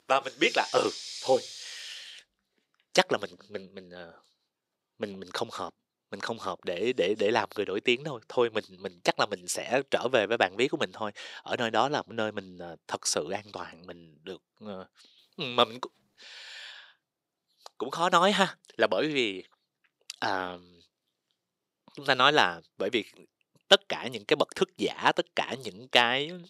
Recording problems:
thin; somewhat; fading below 400 Hz

